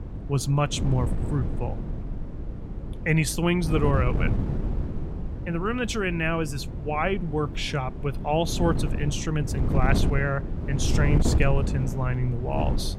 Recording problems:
wind noise on the microphone; heavy; 9 dB below the speech

